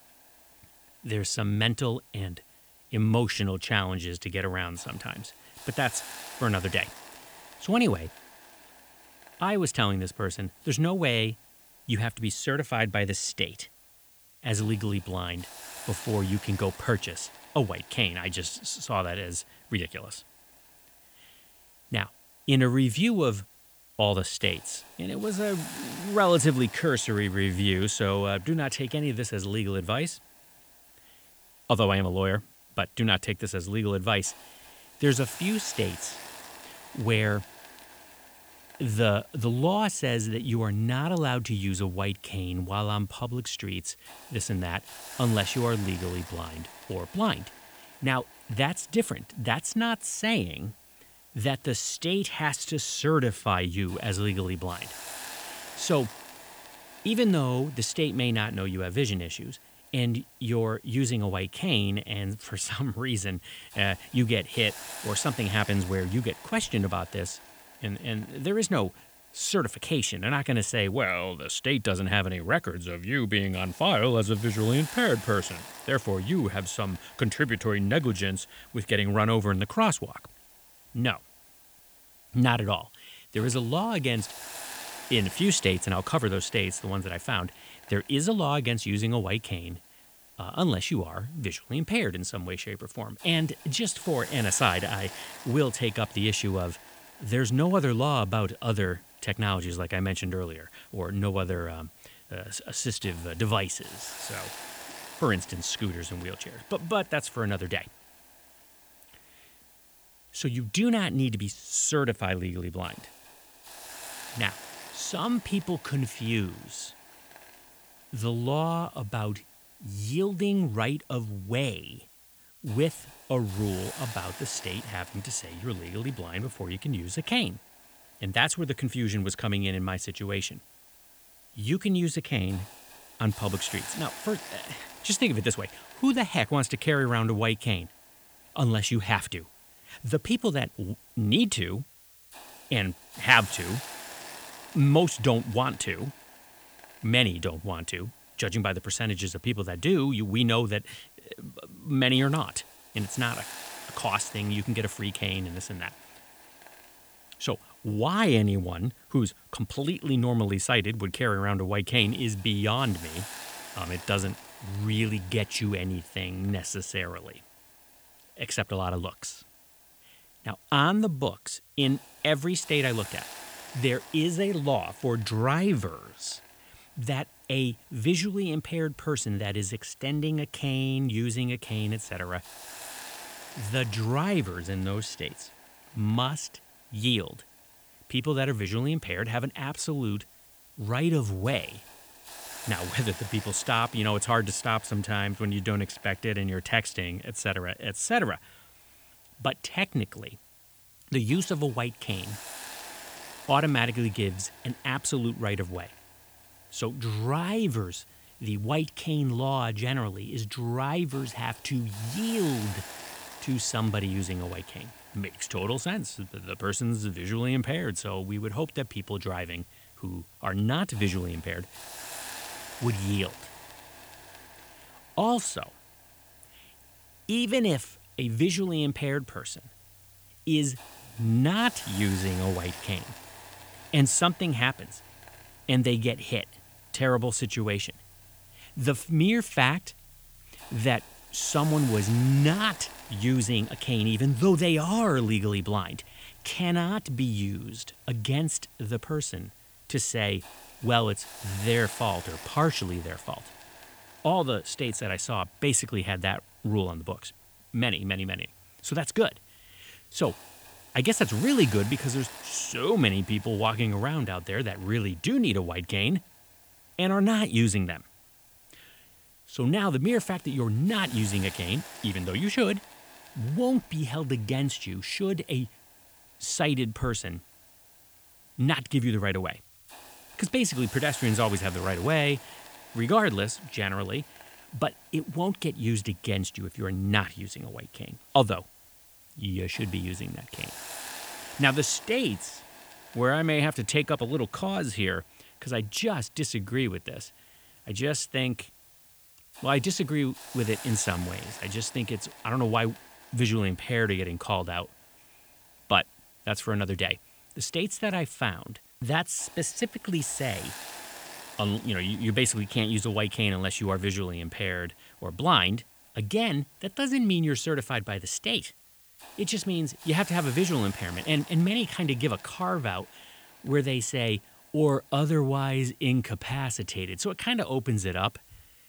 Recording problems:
hiss; noticeable; throughout; 20 dB below the speech

